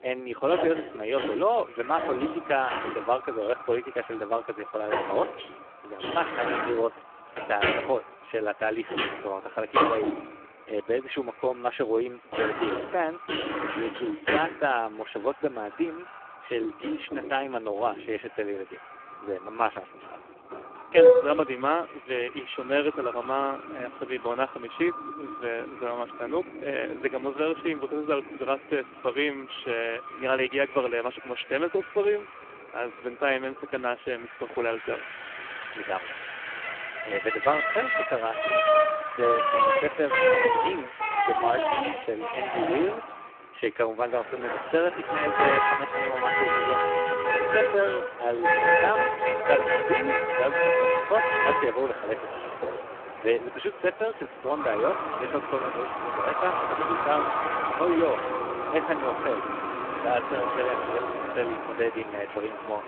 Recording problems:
phone-call audio; poor line
echo of what is said; noticeable; throughout; 440 ms later, 15 dB below the speech
traffic noise; very loud; throughout; 3 dB above the speech

